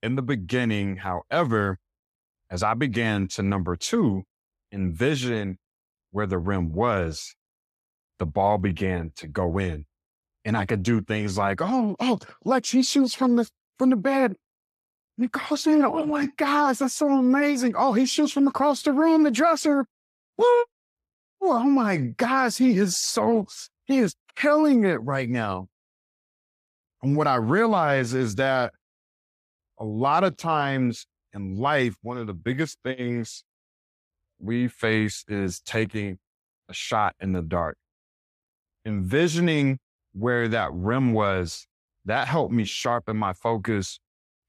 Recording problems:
none

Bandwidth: 14.5 kHz